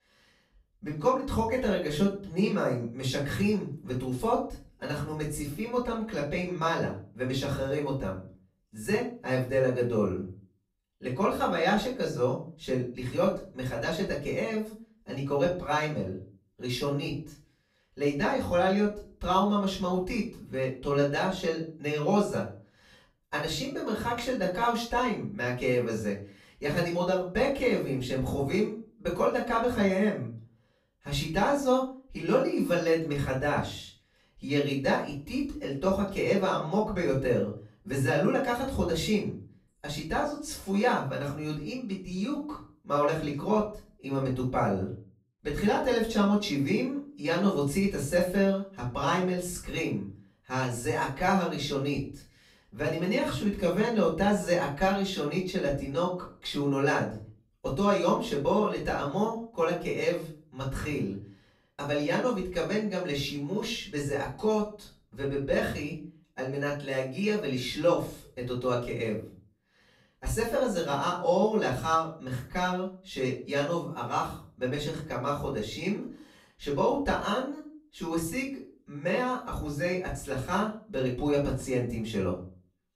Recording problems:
off-mic speech; far
room echo; slight; dies away in 0.4 s

